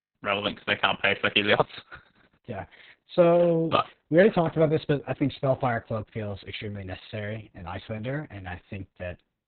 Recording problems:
garbled, watery; badly

